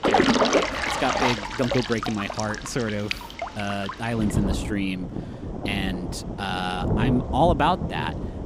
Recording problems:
rain or running water; loud; throughout; as loud as the speech

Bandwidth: 15.5 kHz